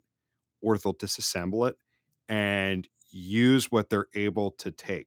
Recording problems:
none

